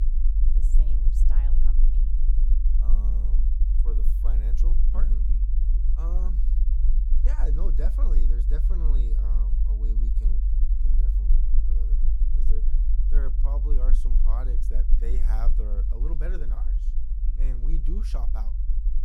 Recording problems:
low rumble; loud; throughout; 4 dB below the speech

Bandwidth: 18.5 kHz